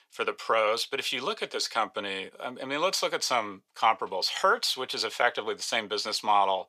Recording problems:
thin; very; fading below 850 Hz

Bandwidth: 15.5 kHz